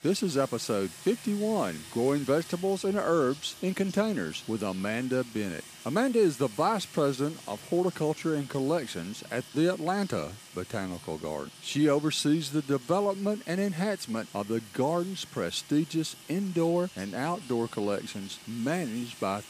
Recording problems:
household noises; noticeable; throughout; 15 dB below the speech

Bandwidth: 15 kHz